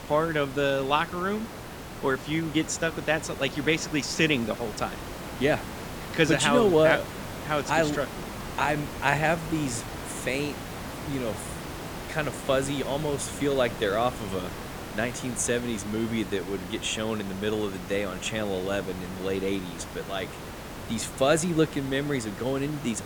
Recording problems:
hiss; noticeable; throughout; 10 dB below the speech

